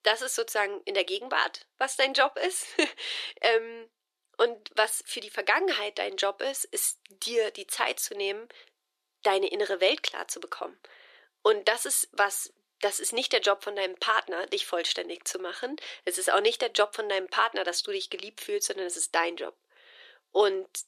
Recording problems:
thin; very; fading below 350 Hz

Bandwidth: 13.5 kHz